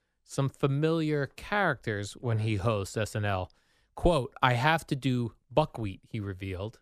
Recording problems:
none

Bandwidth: 14.5 kHz